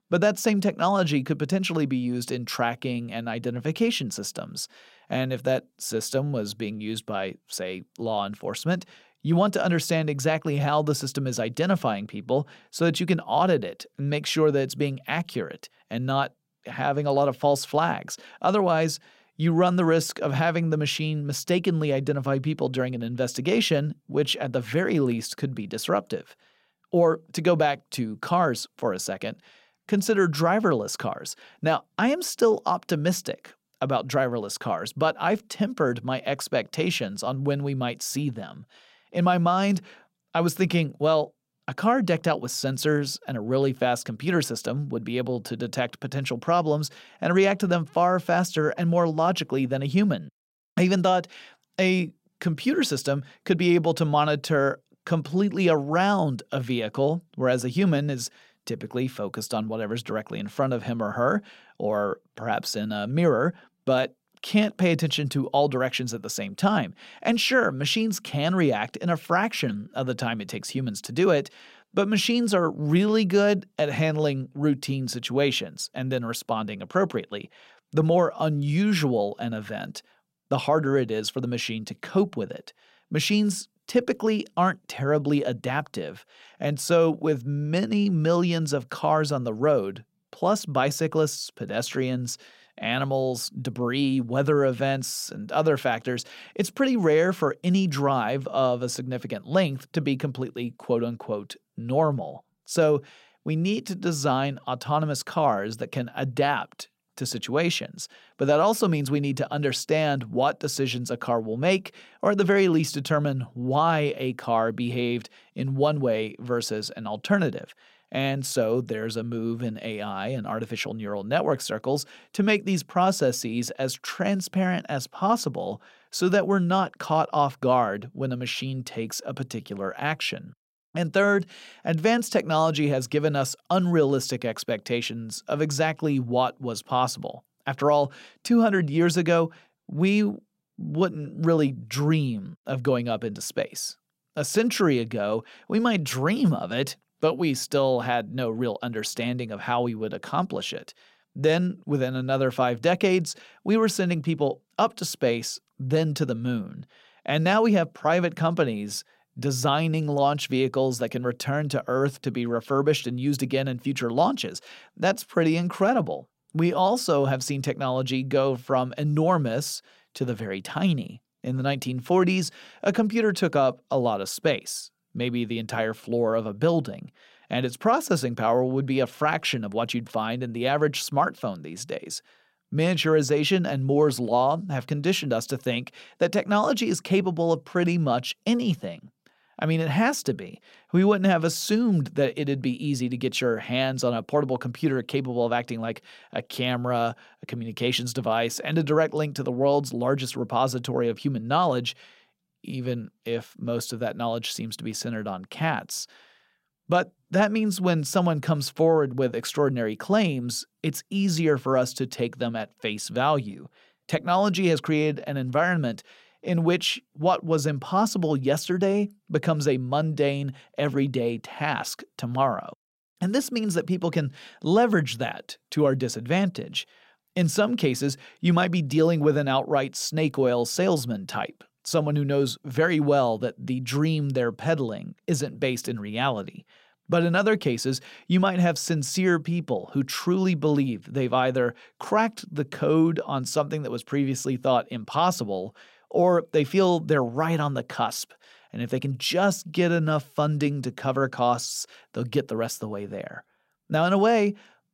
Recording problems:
none

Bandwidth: 16 kHz